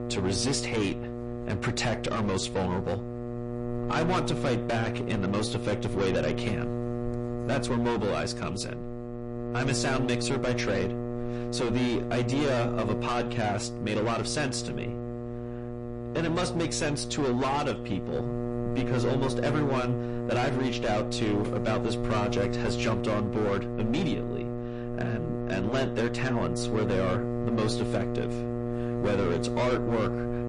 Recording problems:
distortion; heavy; 16% of the sound clipped
garbled, watery; slightly; nothing above 10.5 kHz
electrical hum; loud; throughout; 60 Hz, 6 dB below the speech

